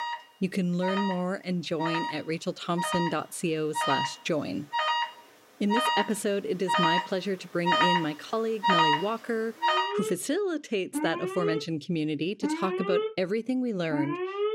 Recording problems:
alarms or sirens; very loud; throughout; 1 dB above the speech

